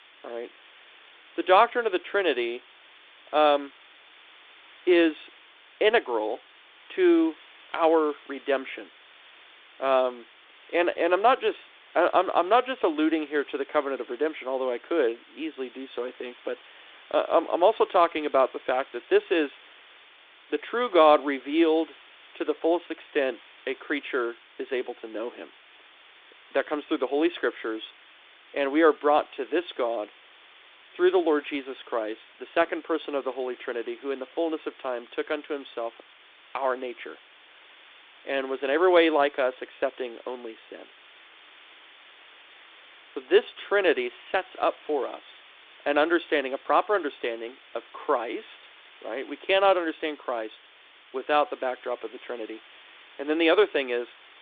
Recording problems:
phone-call audio
hiss; faint; throughout; 25 dB below the speech

